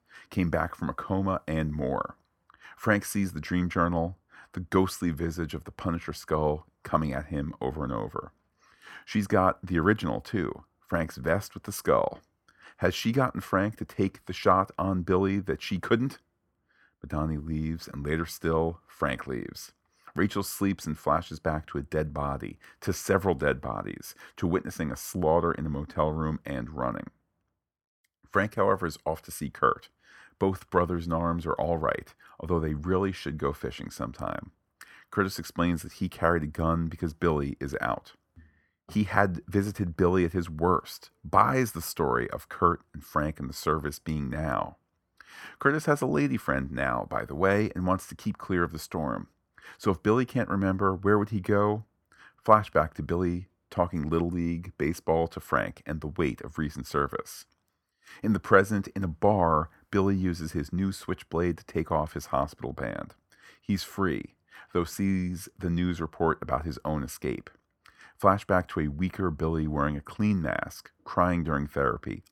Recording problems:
none

